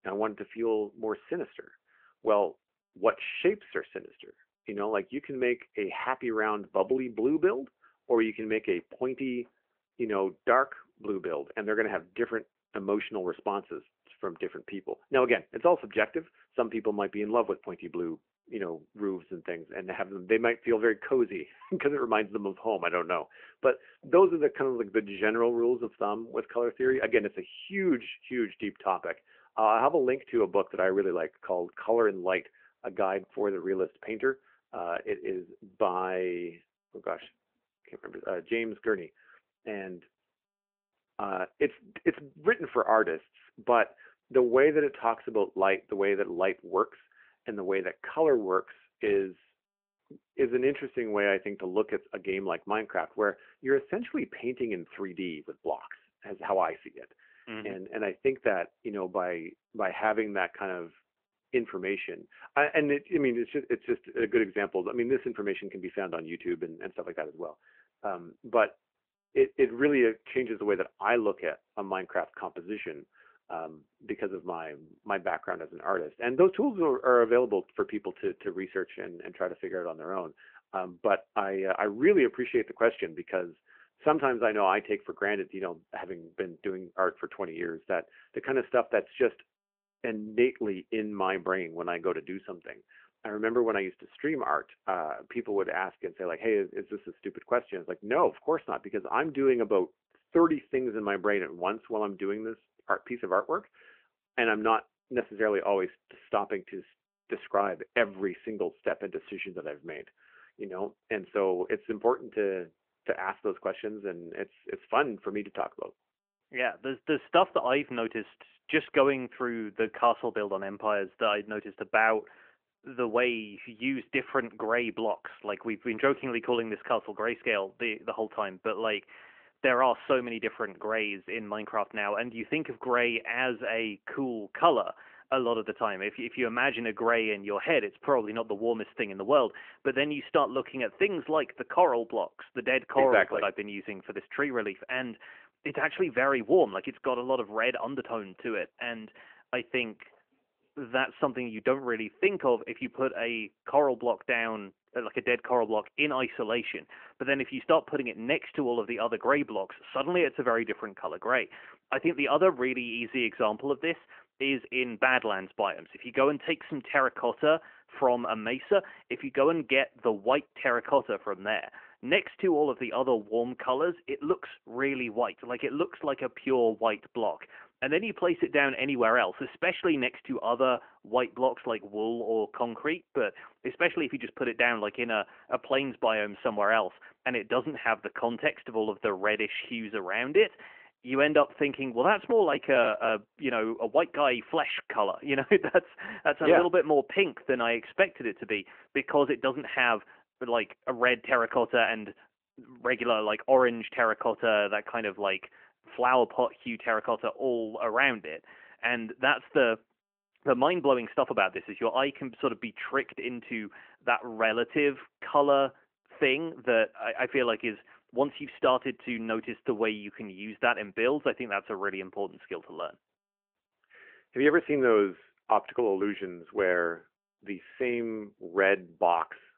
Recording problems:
phone-call audio; nothing above 3 kHz

